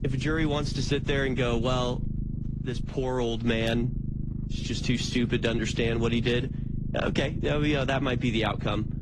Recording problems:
garbled, watery; slightly
low rumble; noticeable; throughout; 15 dB below the speech

